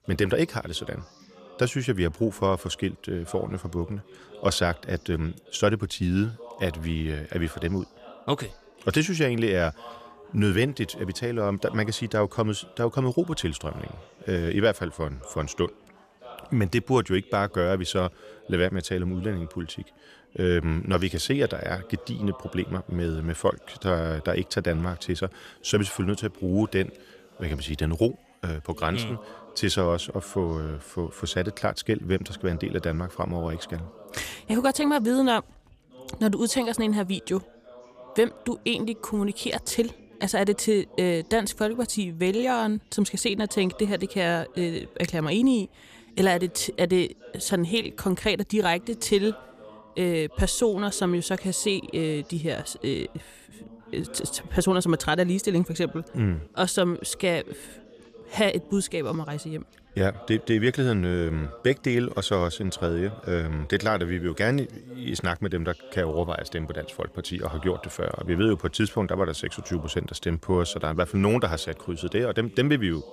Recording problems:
background chatter; faint; throughout; 3 voices, 20 dB below the speech

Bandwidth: 14.5 kHz